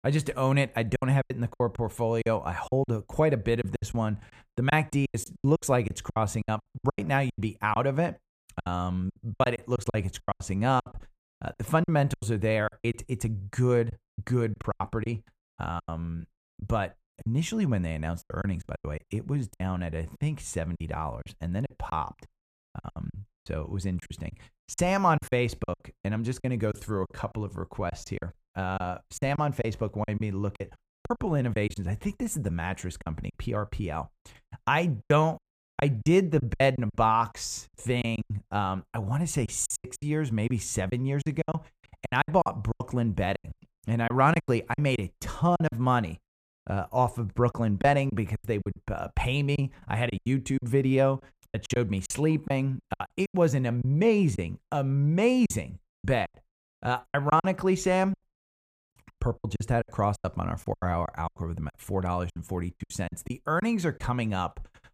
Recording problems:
choppy; very; 13% of the speech affected

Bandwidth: 14.5 kHz